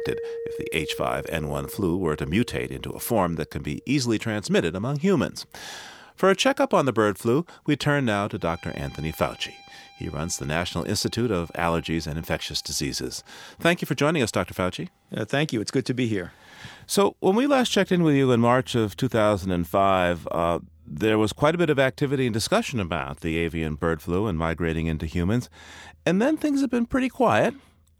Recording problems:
background music; noticeable; throughout; 20 dB below the speech

